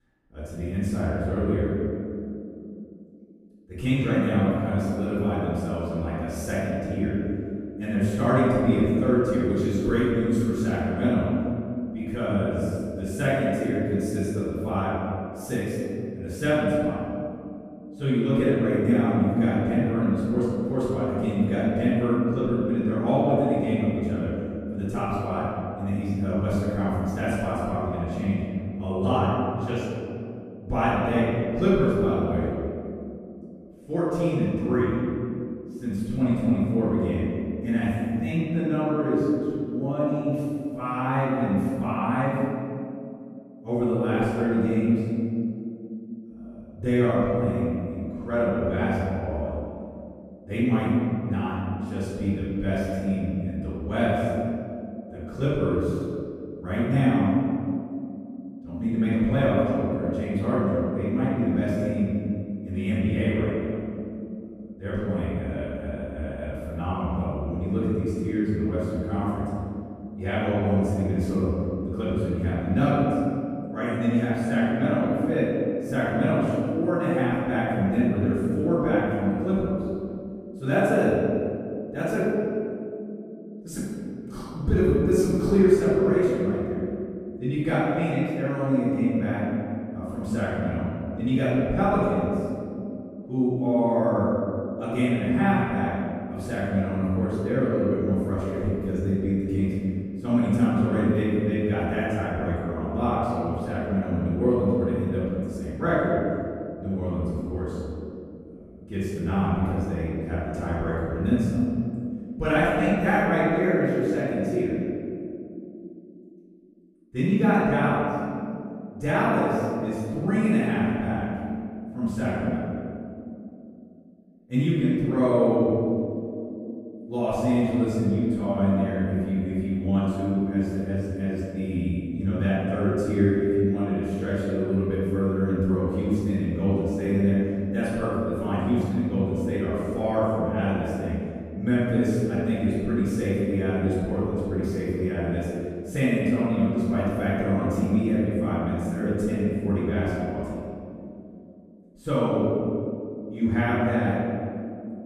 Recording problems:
room echo; strong; dies away in 2.9 s
off-mic speech; far

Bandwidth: 15 kHz